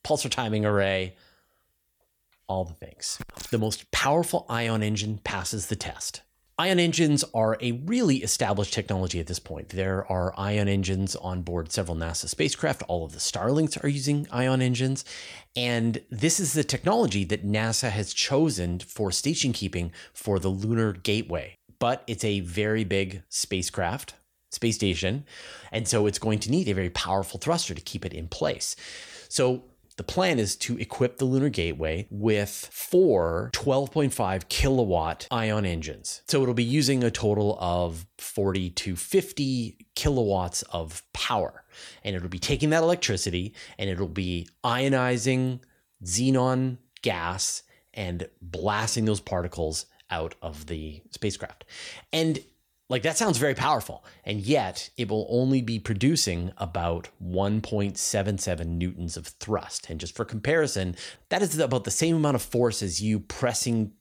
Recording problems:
none

